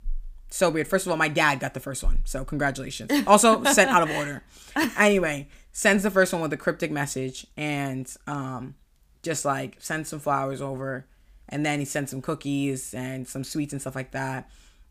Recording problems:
none

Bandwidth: 15 kHz